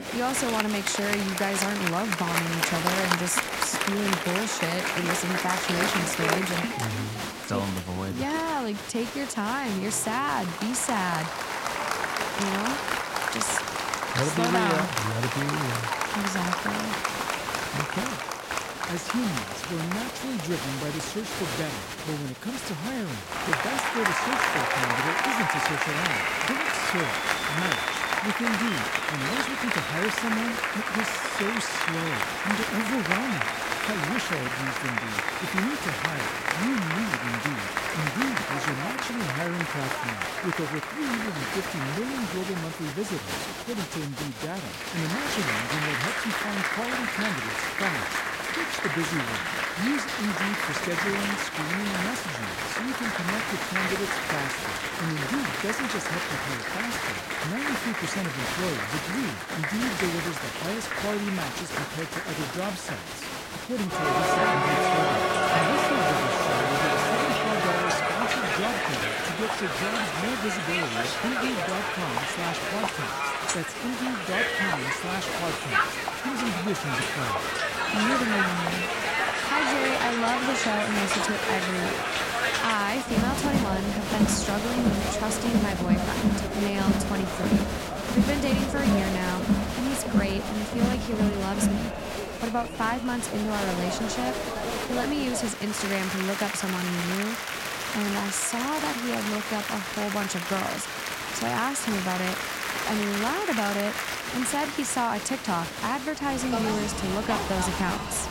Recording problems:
crowd noise; very loud; throughout; 3 dB above the speech

